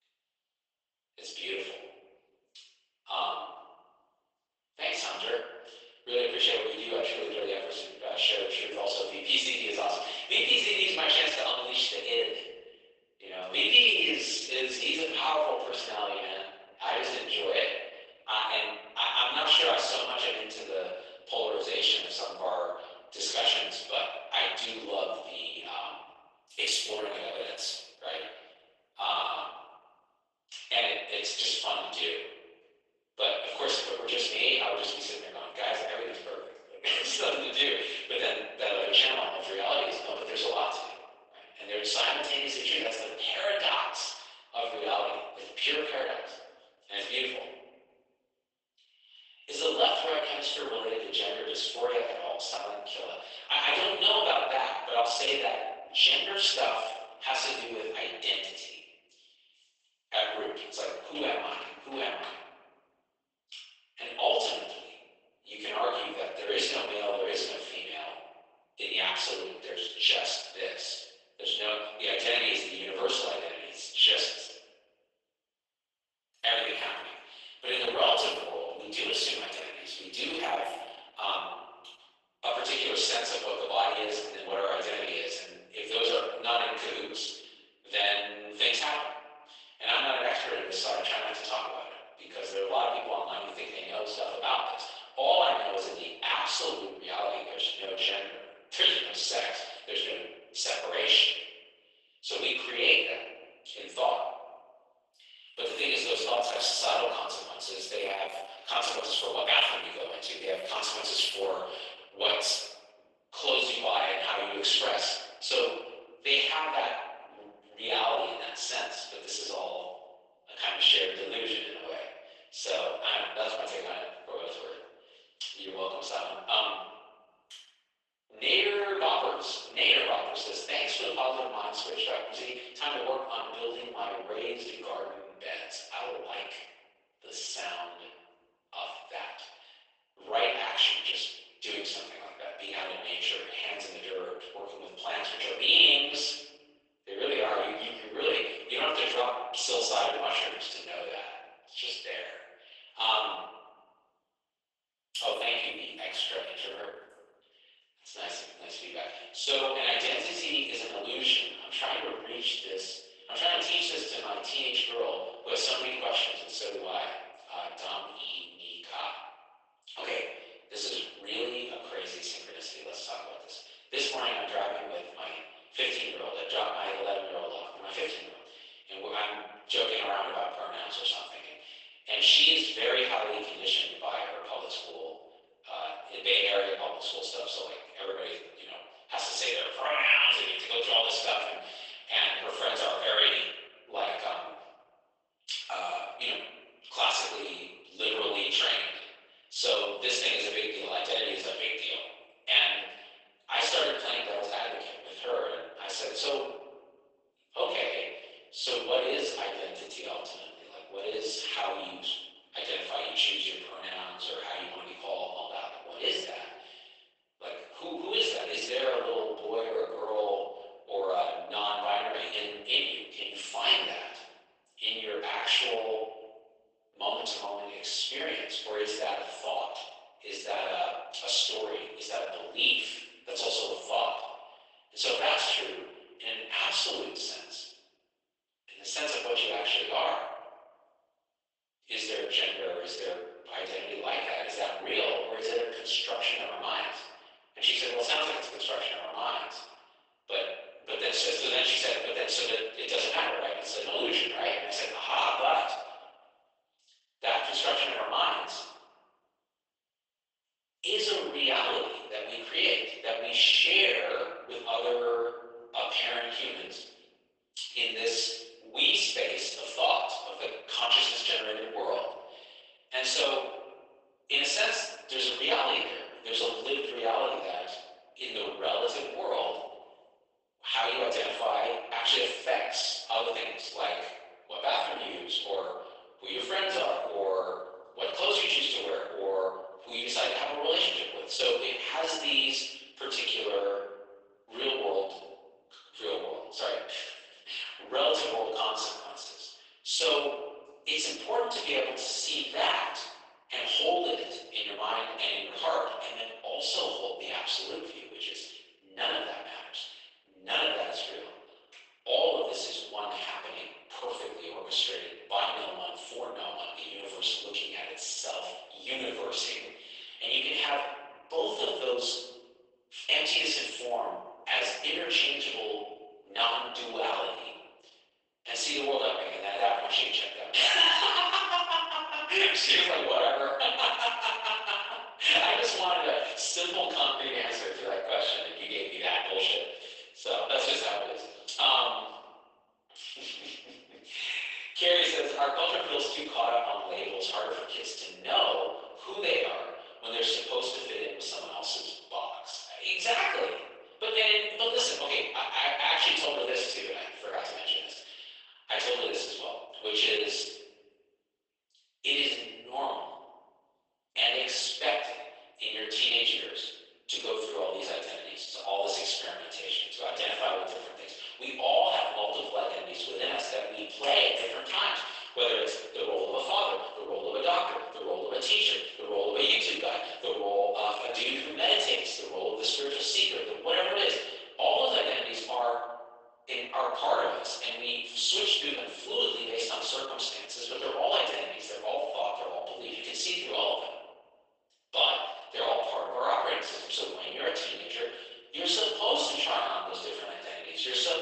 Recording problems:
off-mic speech; far
garbled, watery; badly; nothing above 11.5 kHz
thin; very; fading below 450 Hz
room echo; noticeable; dies away in 0.9 s

